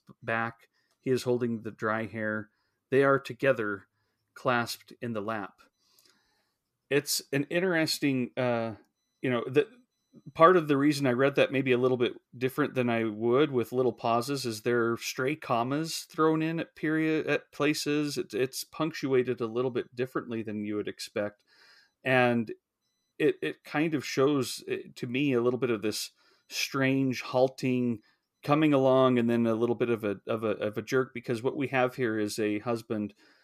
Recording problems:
none

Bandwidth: 14.5 kHz